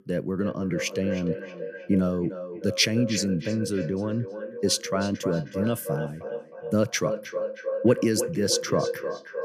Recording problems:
echo of what is said; strong; throughout; 310 ms later, 7 dB below the speech

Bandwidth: 14.5 kHz